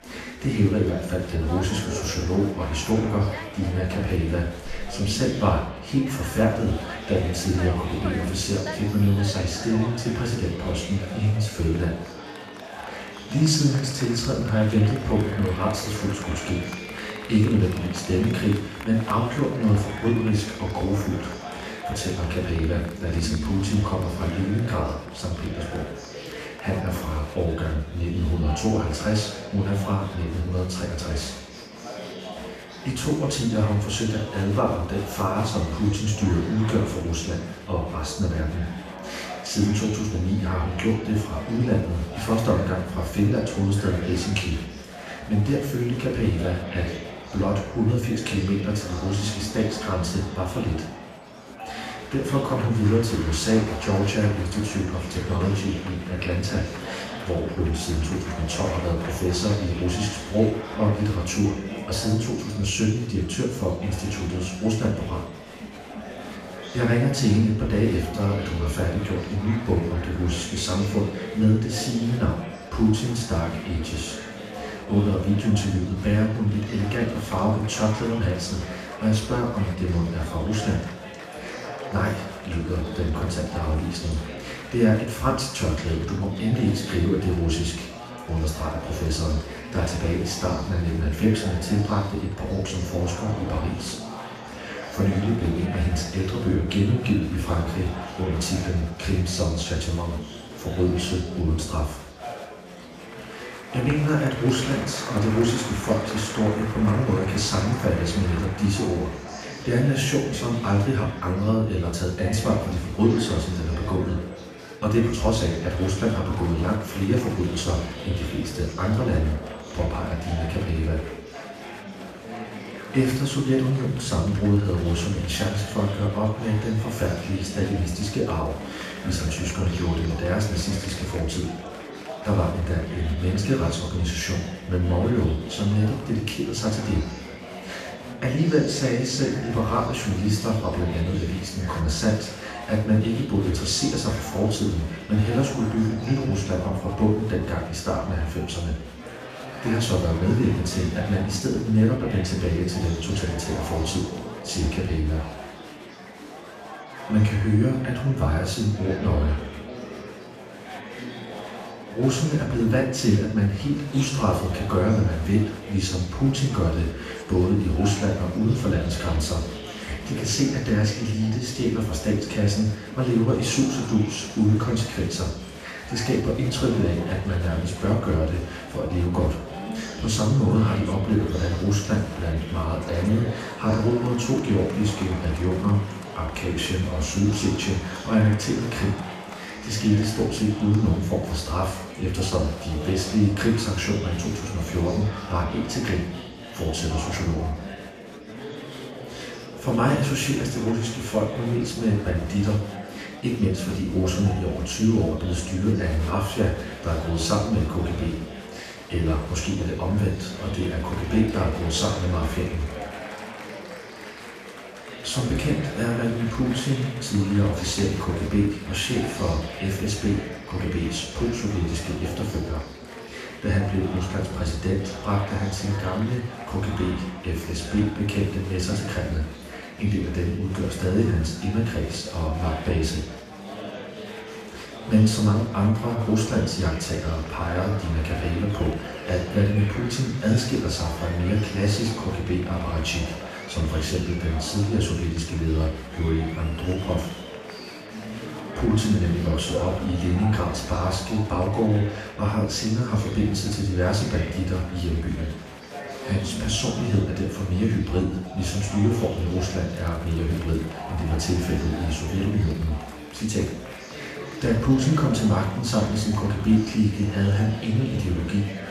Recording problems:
off-mic speech; far
room echo; noticeable; dies away in 0.9 s
murmuring crowd; noticeable; throughout; 10 dB below the speech

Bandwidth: 14.5 kHz